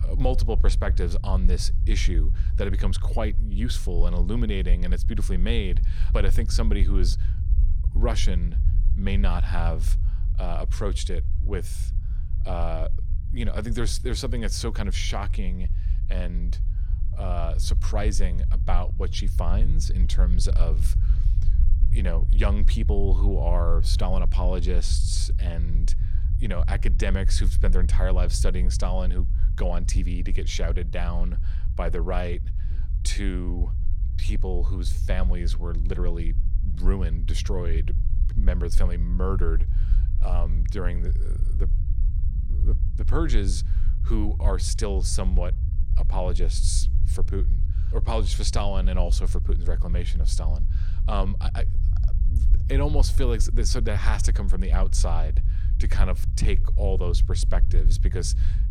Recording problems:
low rumble; noticeable; throughout; 10 dB below the speech

